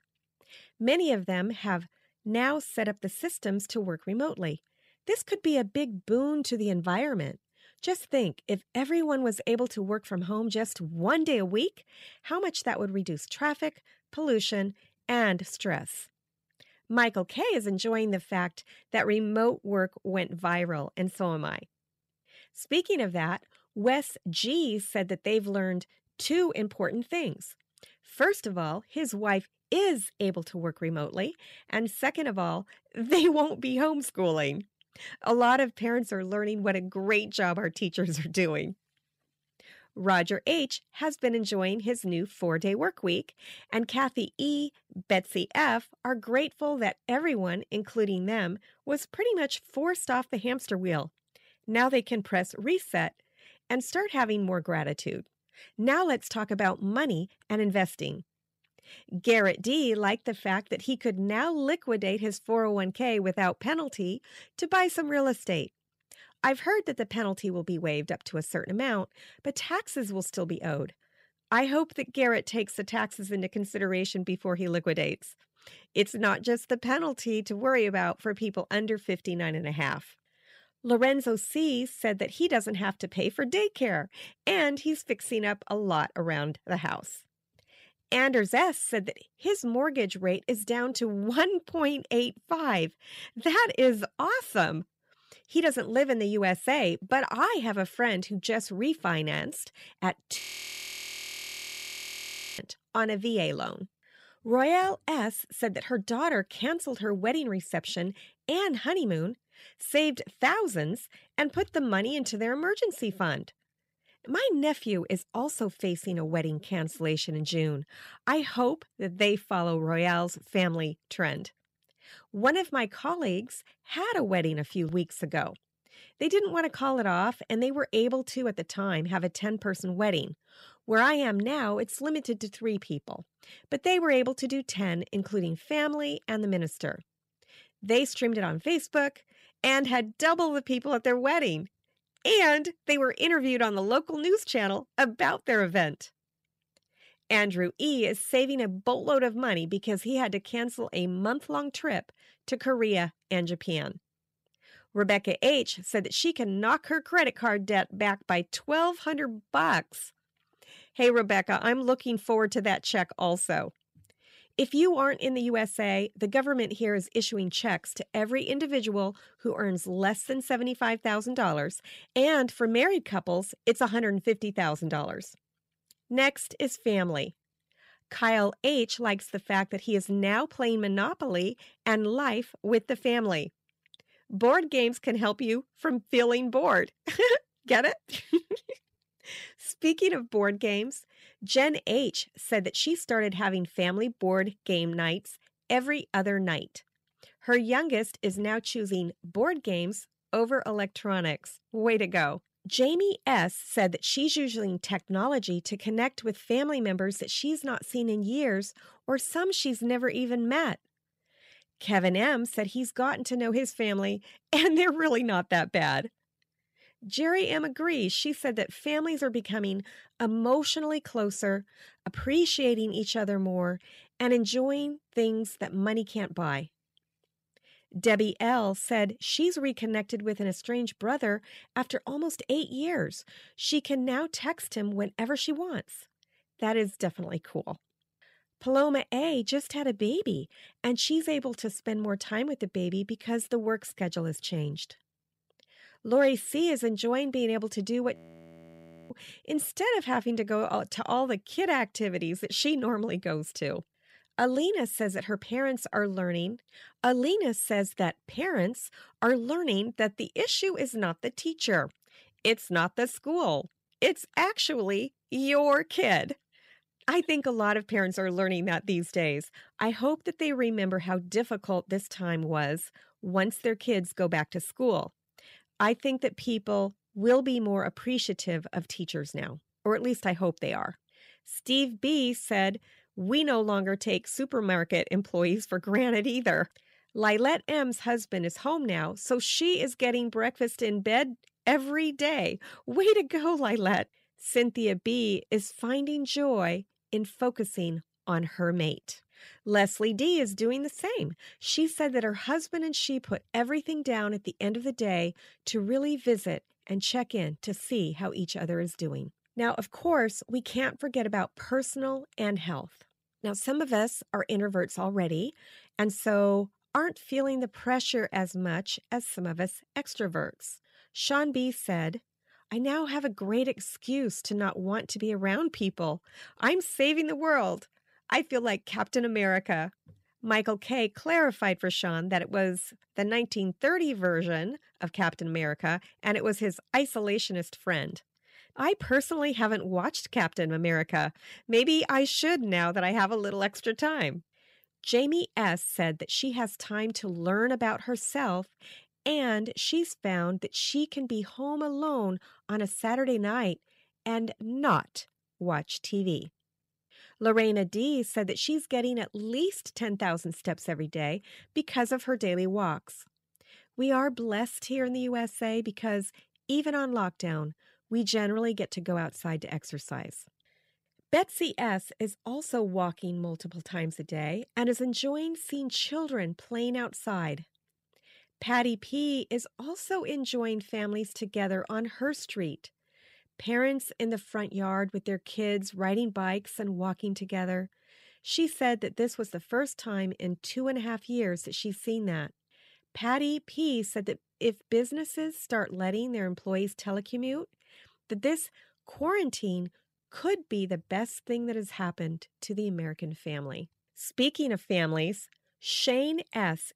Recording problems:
audio freezing; at 1:40 for 2 s and at 4:08 for 1 s

